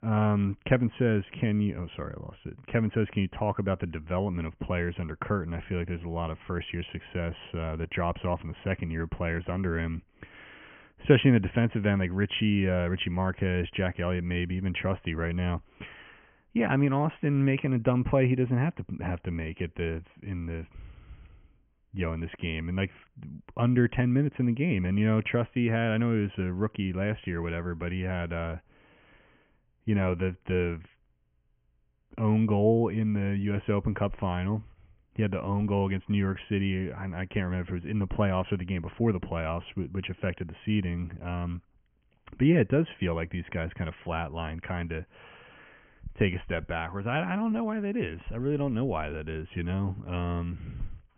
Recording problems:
high frequencies cut off; severe; nothing above 3 kHz

